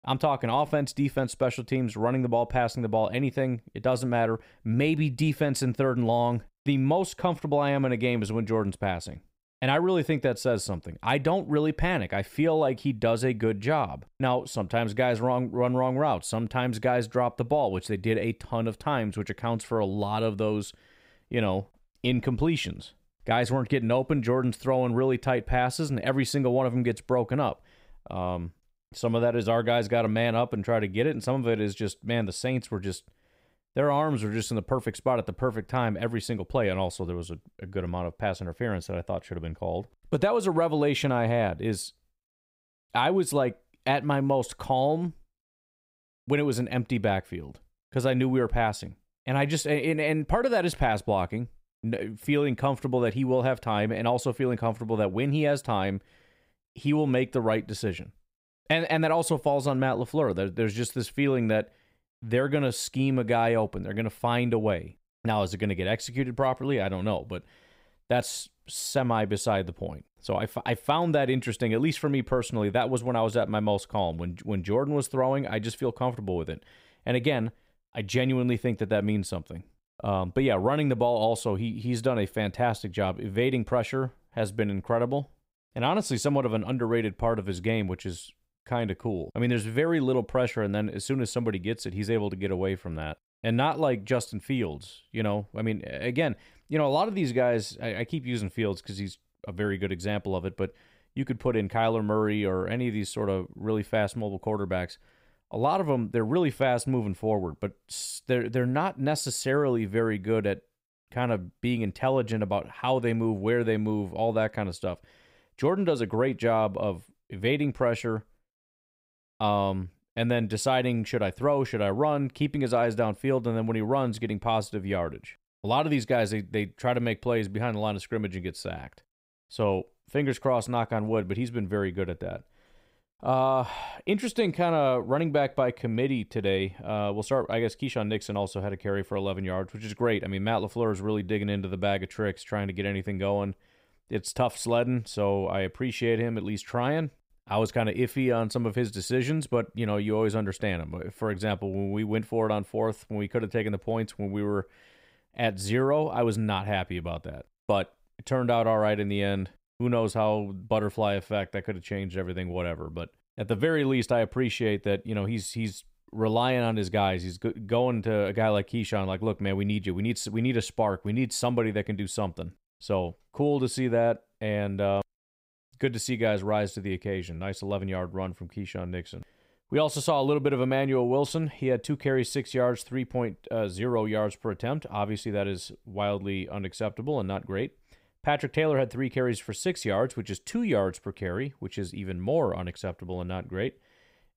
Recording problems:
none

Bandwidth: 15.5 kHz